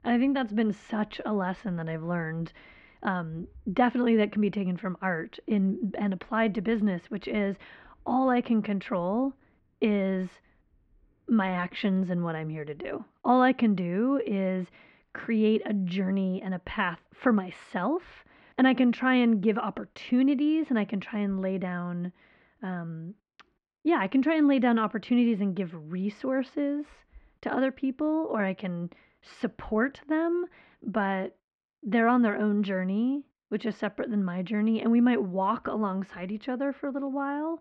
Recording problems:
muffled; very; fading above 2 kHz

